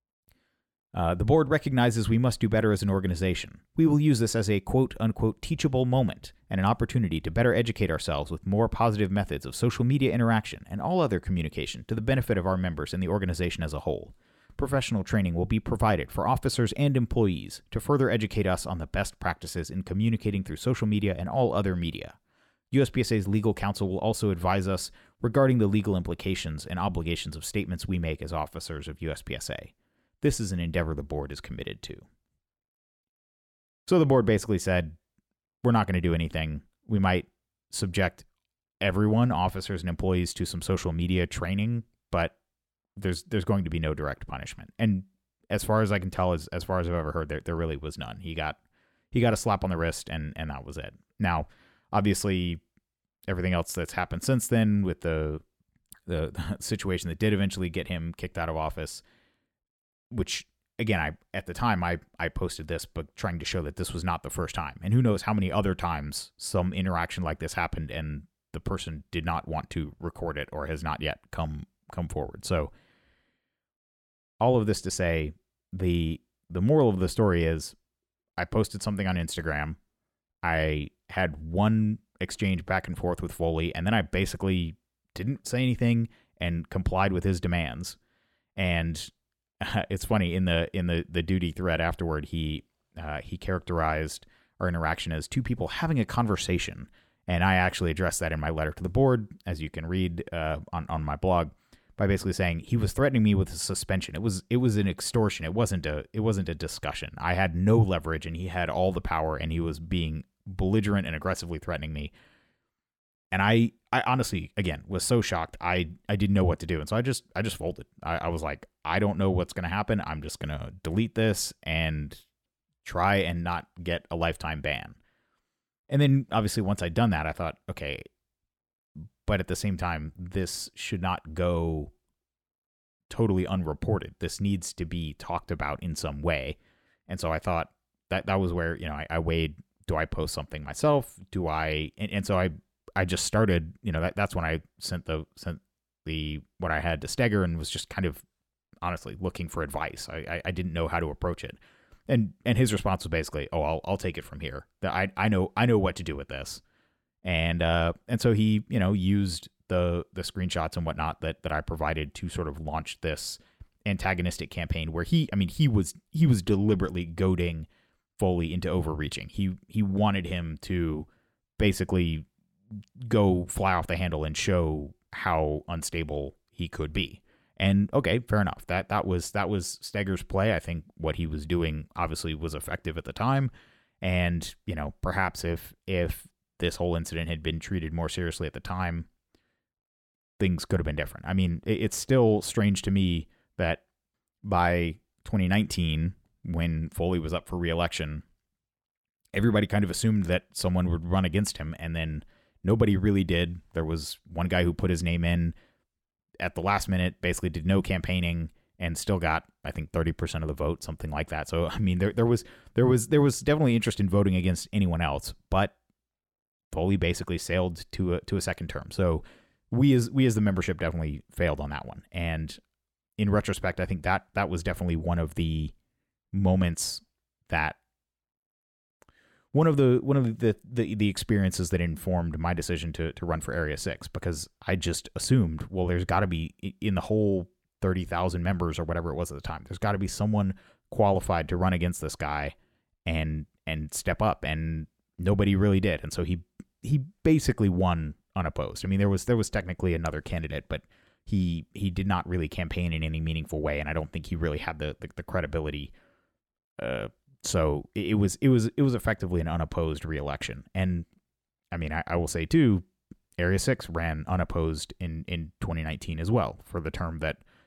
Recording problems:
none

